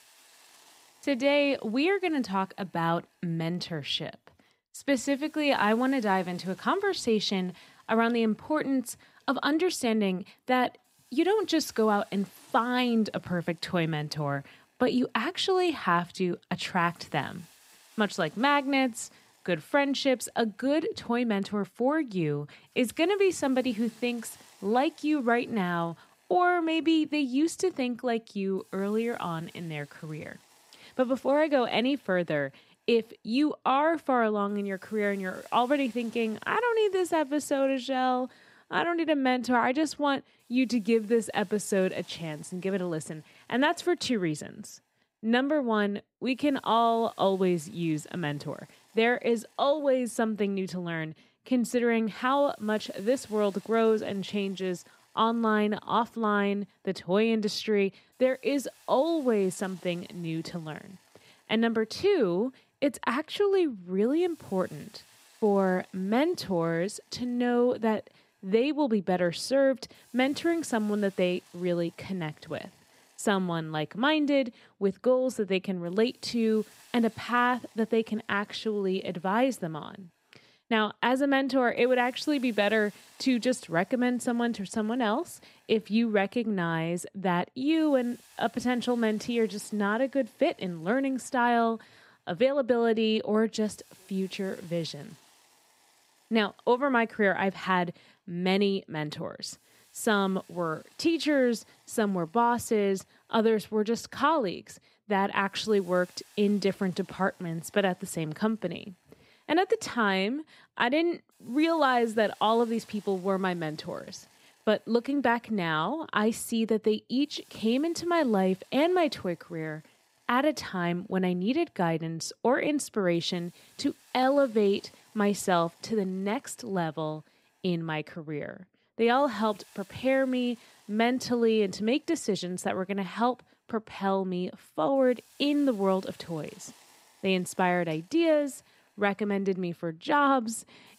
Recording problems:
hiss; faint; throughout; 30 dB below the speech

